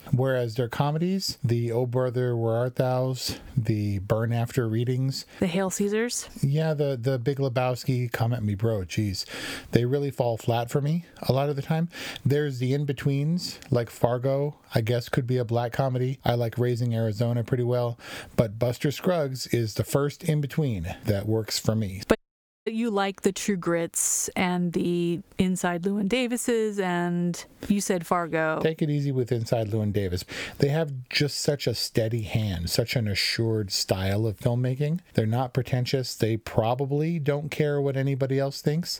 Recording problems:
squashed, flat; somewhat
audio cutting out; at 22 s for 0.5 s

